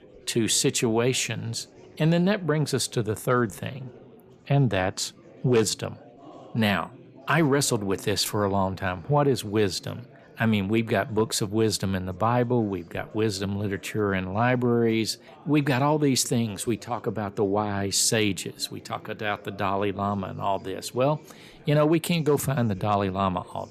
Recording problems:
chatter from many people; faint; throughout; 25 dB below the speech

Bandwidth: 14.5 kHz